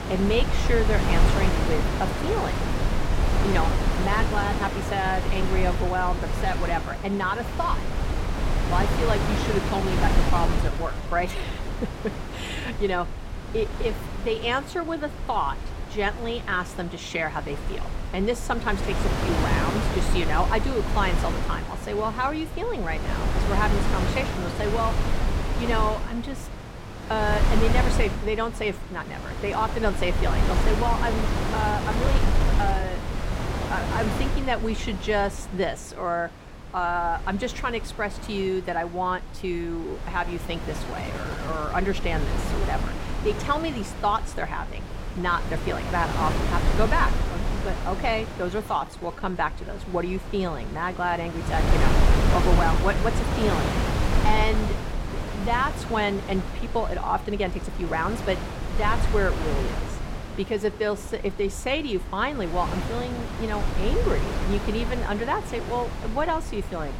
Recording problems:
wind noise on the microphone; heavy; 5 dB below the speech
uneven, jittery; strongly; from 10 to 58 s

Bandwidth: 16 kHz